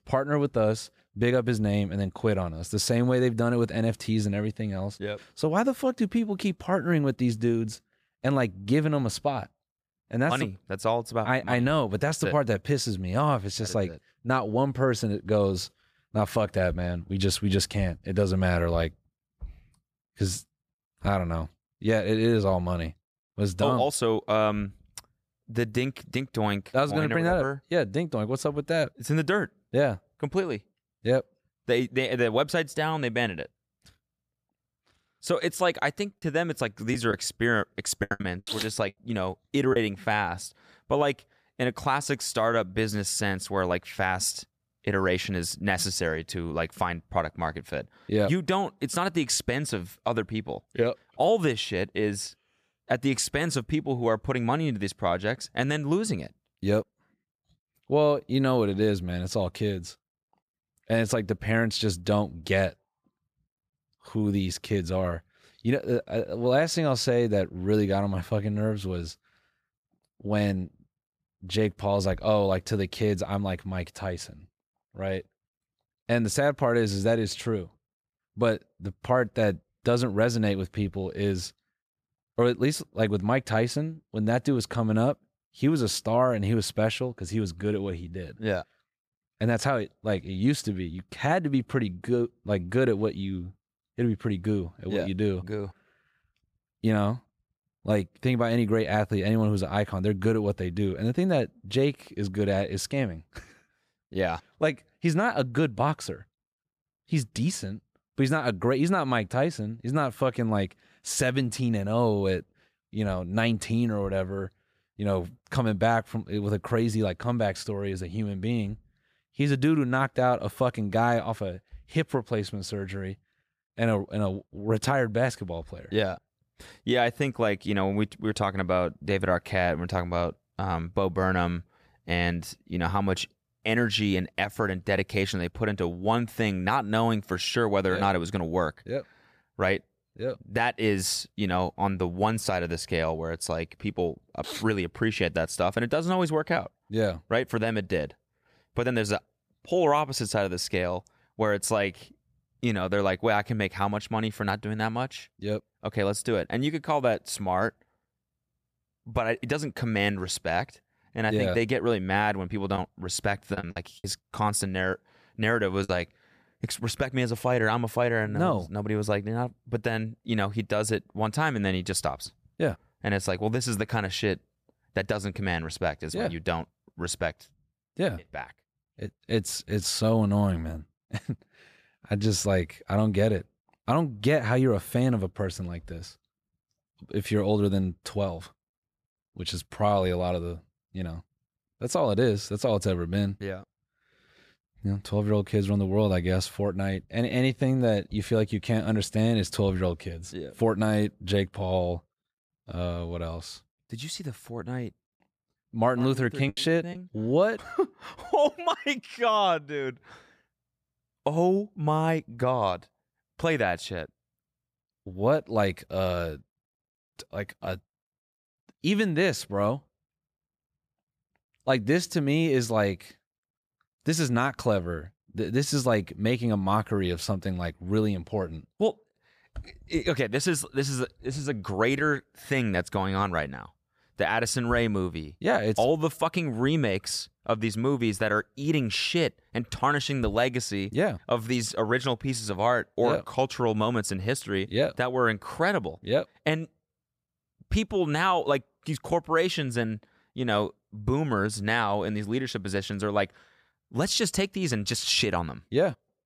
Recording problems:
choppy; very; from 36 to 40 s, from 2:43 to 2:46 and at 3:26; 9% of the speech affected

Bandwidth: 14.5 kHz